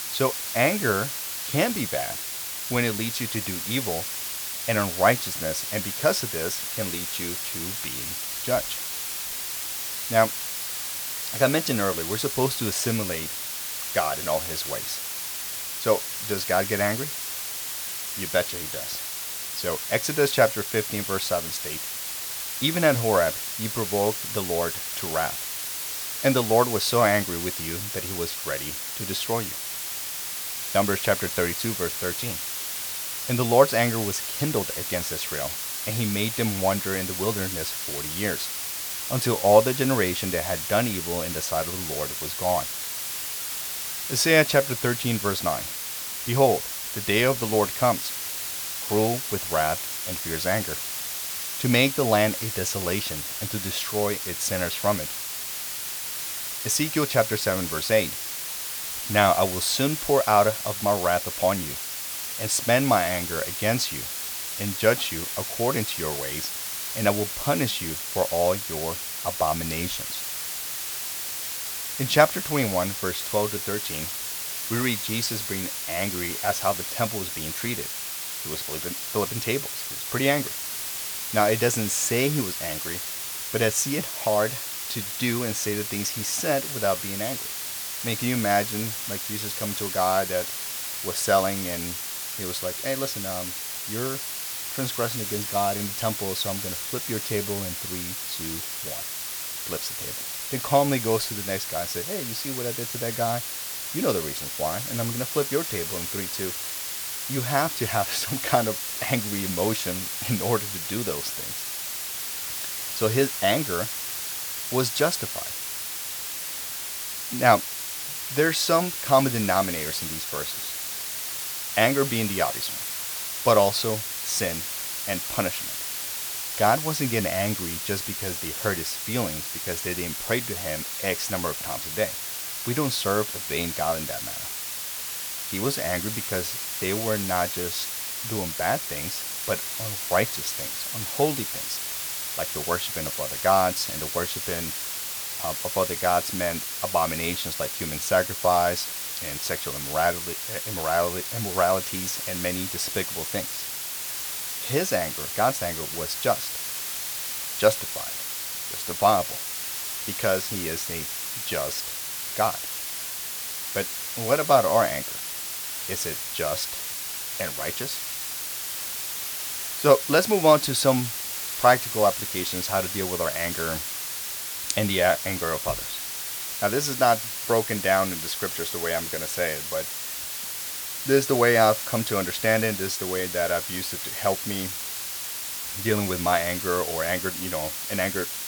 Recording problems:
hiss; loud; throughout; 3 dB below the speech

